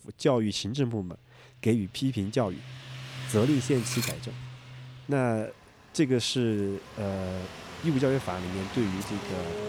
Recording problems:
traffic noise; noticeable; throughout; 10 dB below the speech
clattering dishes; noticeable; at 4 s; peak 4 dB below the speech

